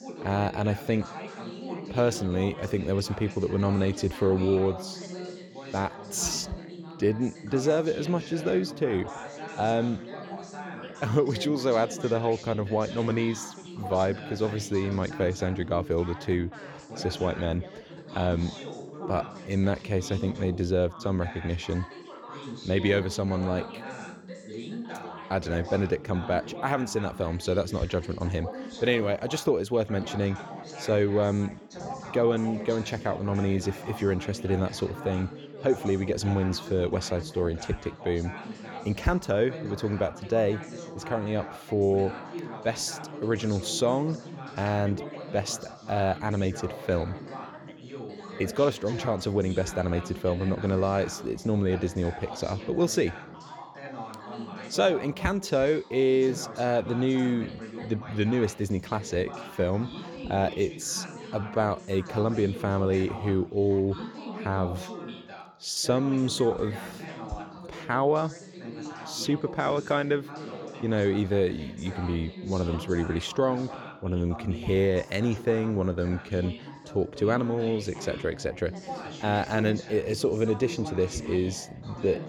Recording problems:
background chatter; noticeable; throughout; 3 voices, 10 dB below the speech

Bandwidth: 18 kHz